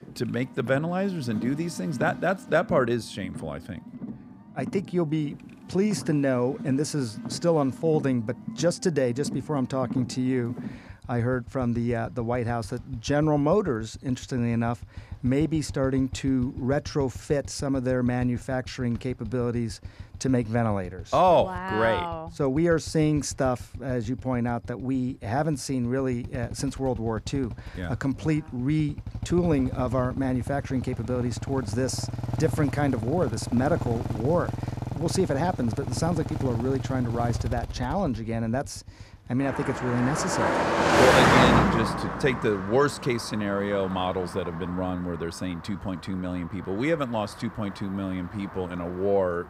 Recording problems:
traffic noise; loud; throughout; 4 dB below the speech

